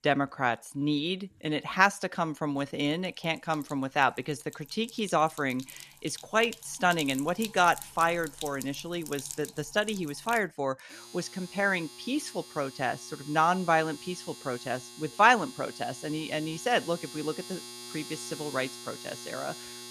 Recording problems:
household noises; noticeable; throughout; 15 dB below the speech

